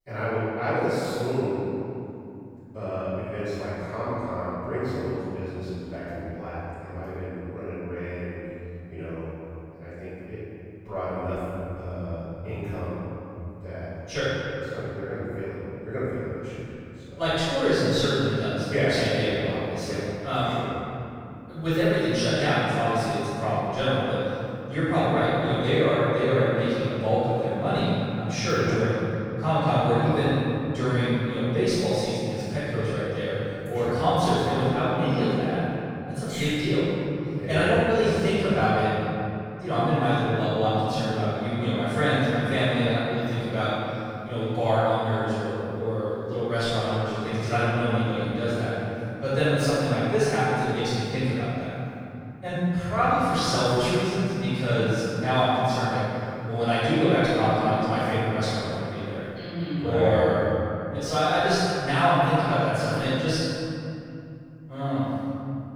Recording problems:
room echo; strong; dies away in 3 s
off-mic speech; far

